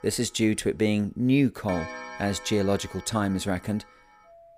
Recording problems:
household noises; noticeable; throughout; 15 dB below the speech

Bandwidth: 15.5 kHz